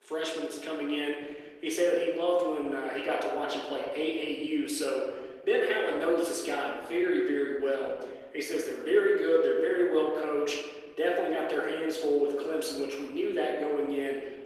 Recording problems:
off-mic speech; far
room echo; noticeable; dies away in 1.2 s
garbled, watery; slightly; nothing above 14.5 kHz
thin; very slightly; fading below 300 Hz

